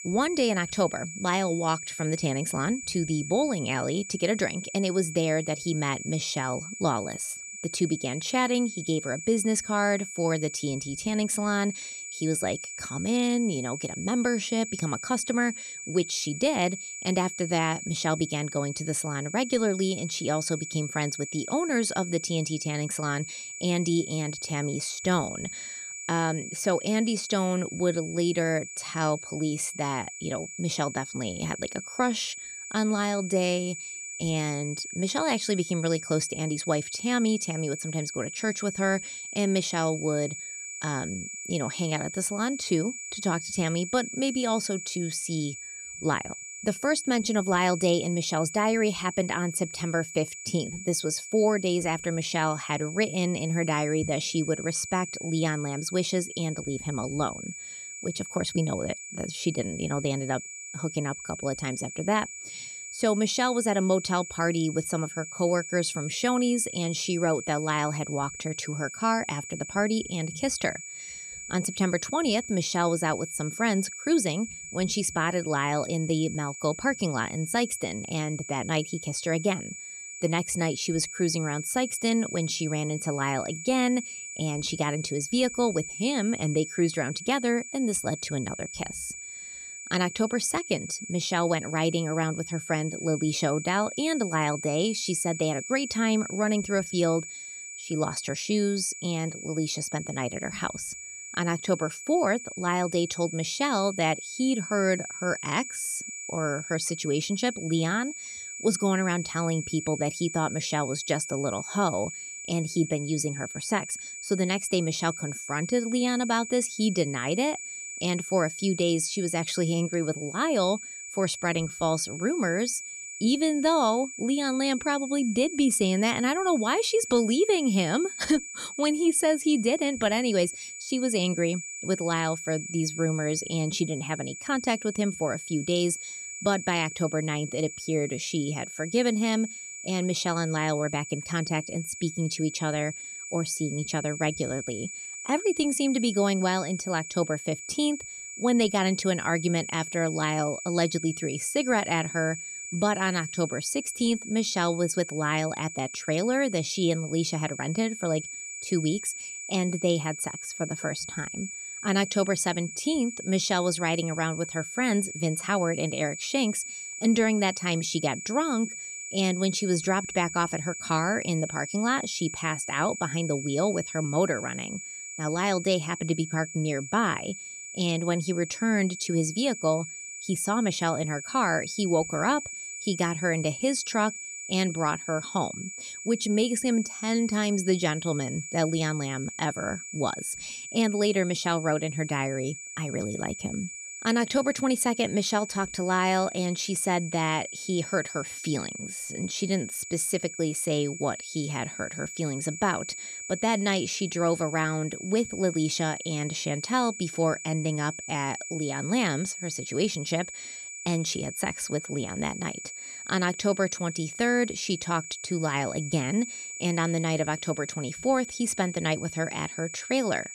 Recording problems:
high-pitched whine; loud; throughout; 7 kHz, 9 dB below the speech

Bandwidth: 14.5 kHz